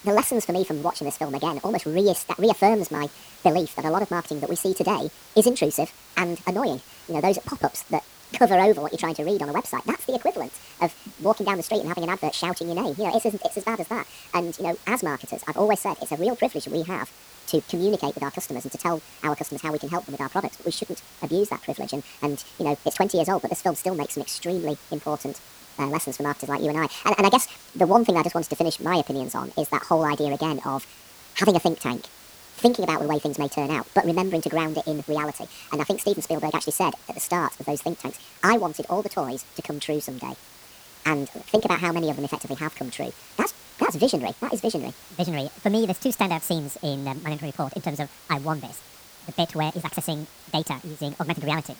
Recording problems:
wrong speed and pitch; too fast and too high; 1.7 times normal speed
hiss; noticeable; throughout; 20 dB below the speech

